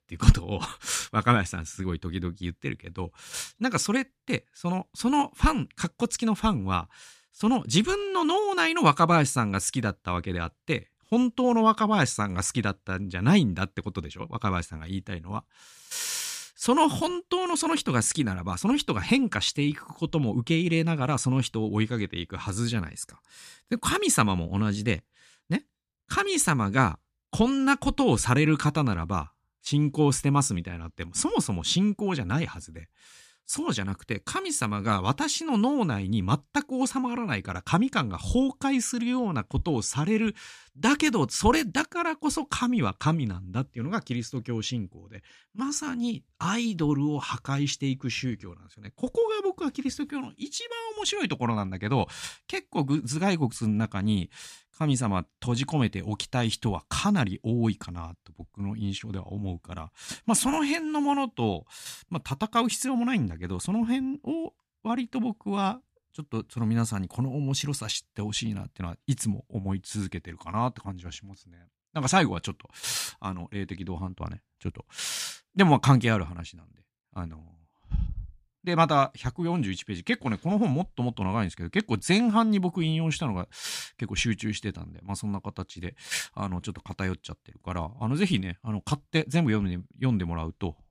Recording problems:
none

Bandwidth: 14.5 kHz